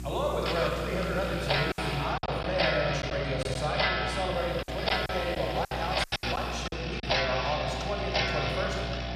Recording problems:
room echo; noticeable; dies away in 1.9 s
off-mic speech; somewhat distant
electrical hum; noticeable; throughout; 60 Hz, 20 dB below the speech
household noises; very faint; throughout; as loud as the speech
hiss; very faint; until 2 s and from 4.5 to 6.5 s; 20 dB below the speech
choppy; very; from 1.5 to 3.5 s and from 5 to 6.5 s; 11% of the speech affected

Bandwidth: 14.5 kHz